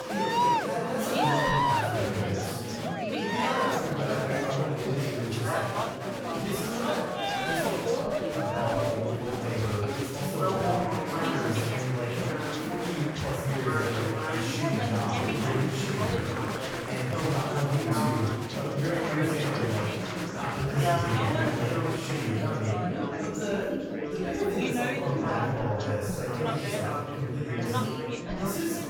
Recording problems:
room echo; strong; dies away in 1.2 s
off-mic speech; far
chatter from many people; very loud; throughout; 1 dB above the speech

